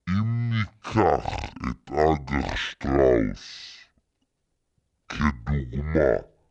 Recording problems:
wrong speed and pitch; too slow and too low; 0.5 times normal speed

